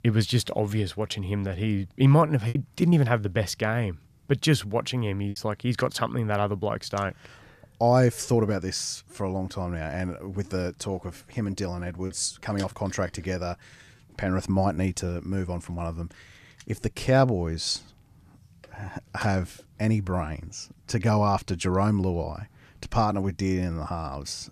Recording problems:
choppy; very; from 2 to 5.5 s and from 12 to 15 s; 6% of the speech affected

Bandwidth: 14.5 kHz